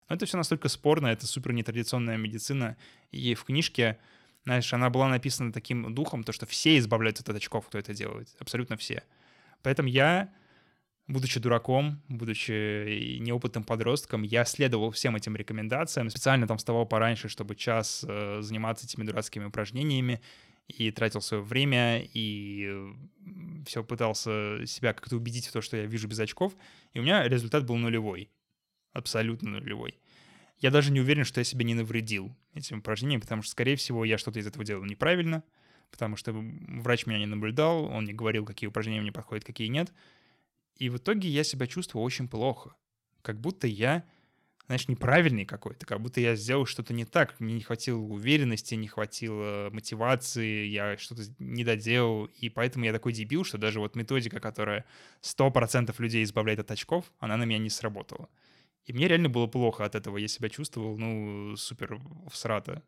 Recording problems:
none

